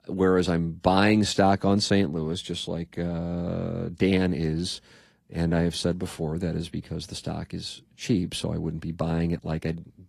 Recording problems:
garbled, watery; slightly

